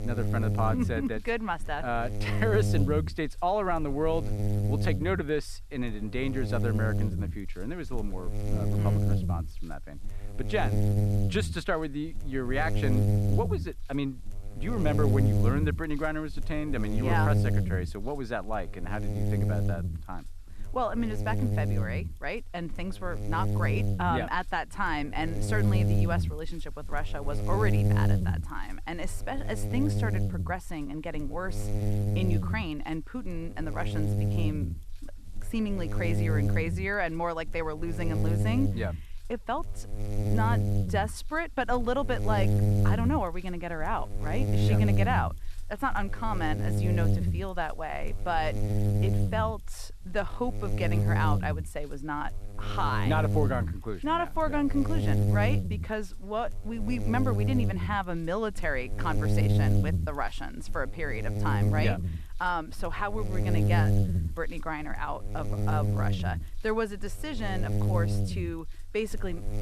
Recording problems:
electrical hum; loud; throughout; 60 Hz, 7 dB below the speech

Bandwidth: 13.5 kHz